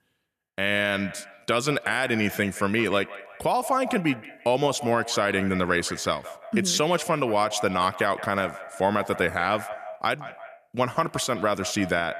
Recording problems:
echo of what is said; noticeable; throughout; 170 ms later, 15 dB below the speech

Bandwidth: 14.5 kHz